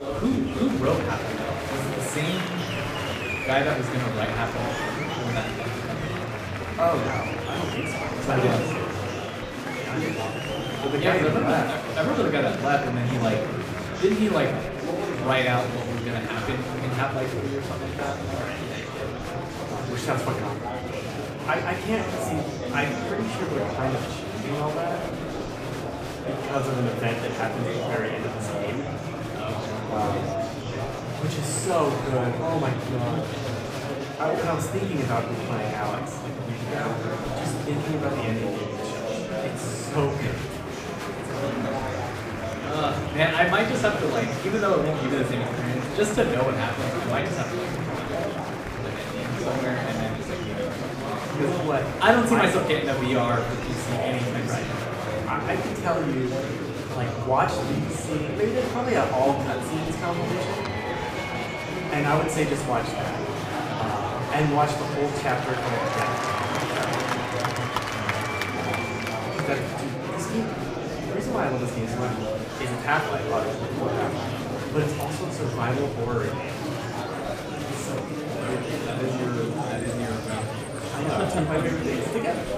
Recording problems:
off-mic speech; far
room echo; slight; dies away in 0.6 s
murmuring crowd; loud; throughout; 2 dB below the speech

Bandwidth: 15 kHz